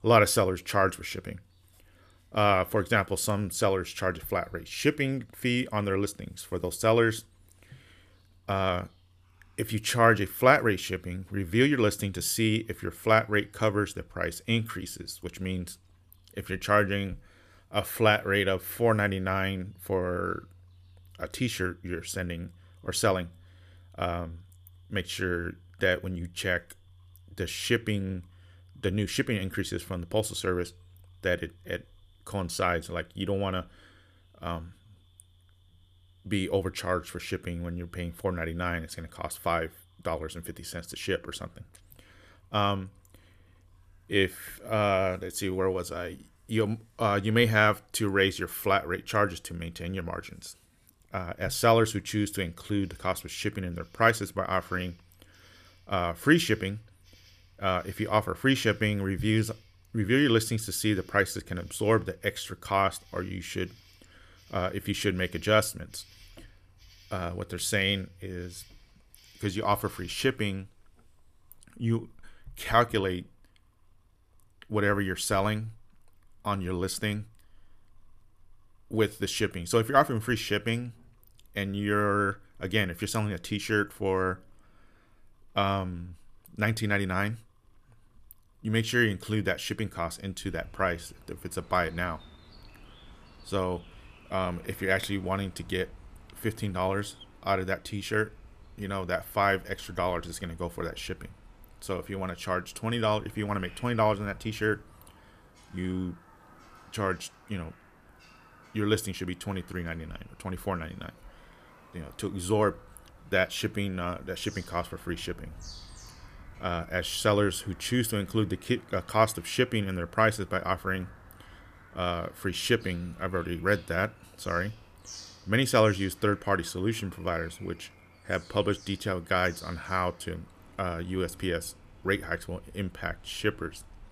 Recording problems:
animal sounds; faint; throughout; 25 dB below the speech

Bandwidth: 14.5 kHz